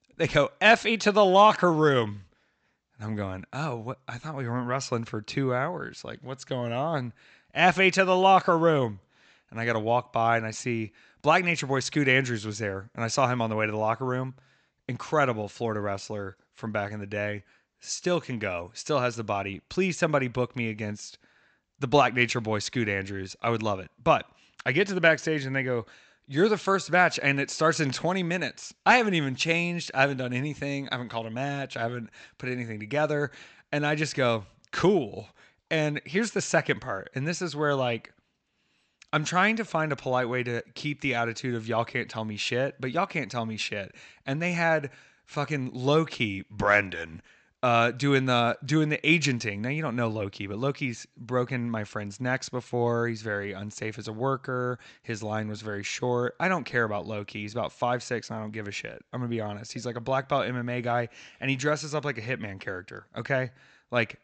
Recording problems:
high frequencies cut off; noticeable; nothing above 8 kHz

